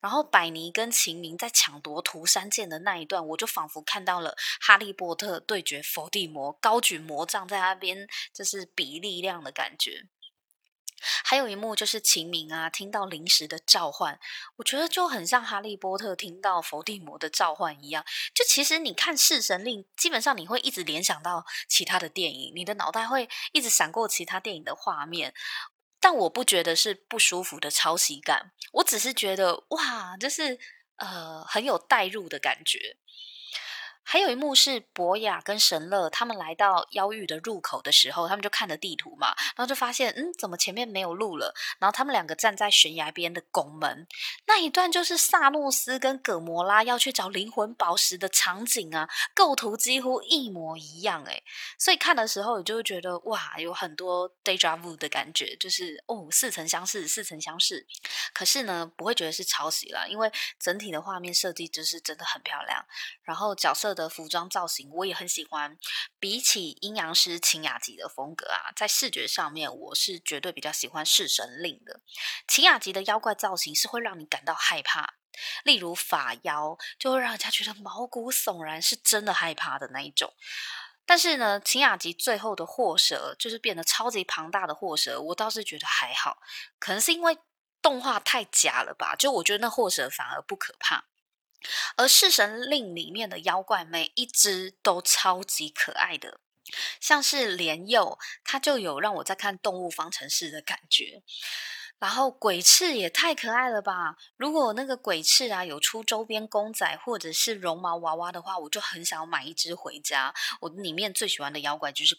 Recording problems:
thin; very; fading below 700 Hz

